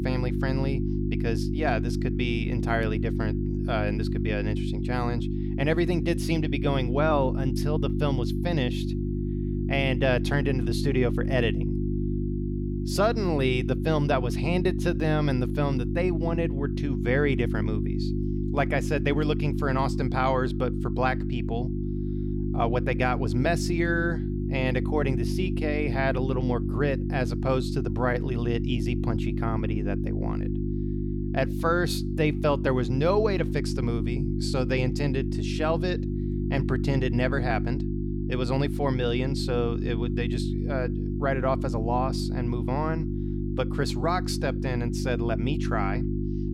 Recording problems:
electrical hum; loud; throughout; 50 Hz, 7 dB below the speech

